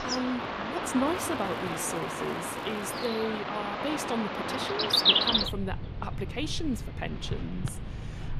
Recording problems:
animal sounds; very loud; throughout; 4 dB above the speech
crackling; faint; from 1 to 3 s; 25 dB below the speech

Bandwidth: 14.5 kHz